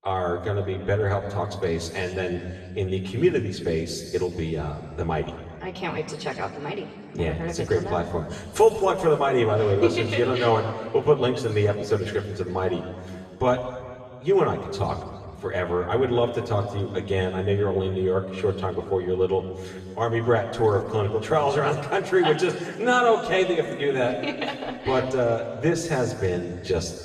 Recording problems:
off-mic speech; far
room echo; noticeable; dies away in 1.9 s

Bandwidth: 14.5 kHz